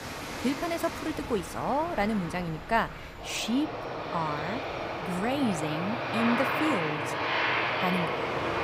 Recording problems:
train or aircraft noise; loud; throughout; as loud as the speech
crowd noise; noticeable; until 5 s; 20 dB below the speech
rain or running water; faint; throughout; 20 dB below the speech

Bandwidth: 15.5 kHz